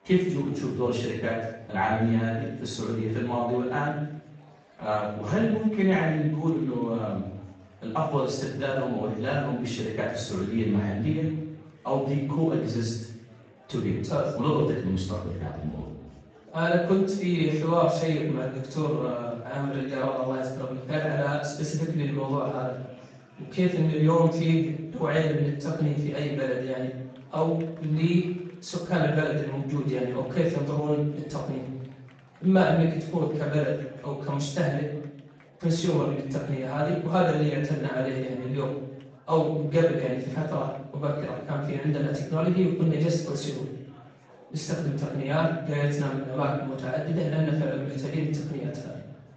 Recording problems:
off-mic speech; far
room echo; noticeable; dies away in 0.7 s
garbled, watery; slightly; nothing above 7.5 kHz
chatter from many people; faint; throughout; 25 dB below the speech

